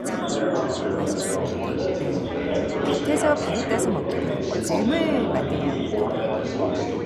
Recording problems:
chatter from many people; very loud; throughout; 4 dB above the speech

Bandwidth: 15 kHz